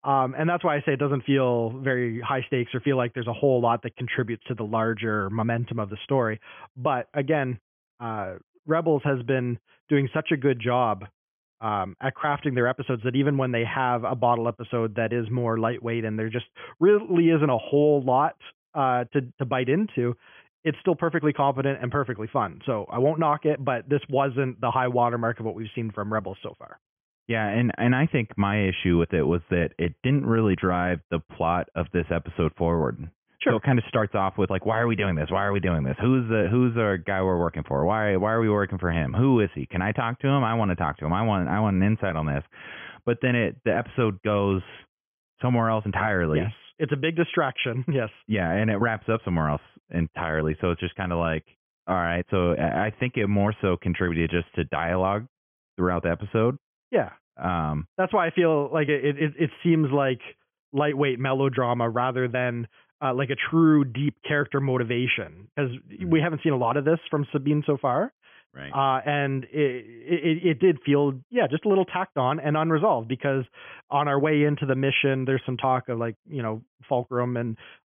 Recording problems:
high frequencies cut off; severe; nothing above 3.5 kHz

